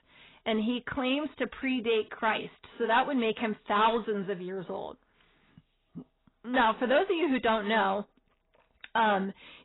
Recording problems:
garbled, watery; badly; nothing above 4 kHz
distortion; slight; 10 dB below the speech

